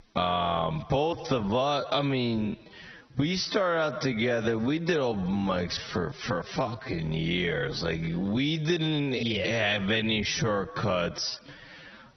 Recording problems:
garbled, watery; badly; nothing above 6 kHz
squashed, flat; heavily
wrong speed, natural pitch; too slow; 0.5 times normal speed

